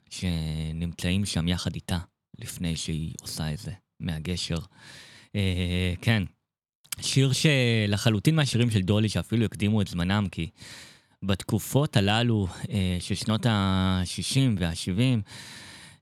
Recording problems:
none

